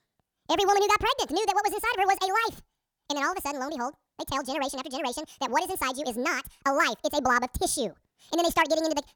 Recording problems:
wrong speed and pitch; too fast and too high; 1.7 times normal speed

